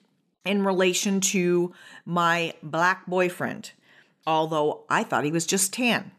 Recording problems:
none

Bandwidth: 14 kHz